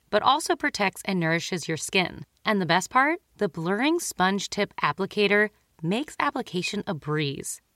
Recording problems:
none

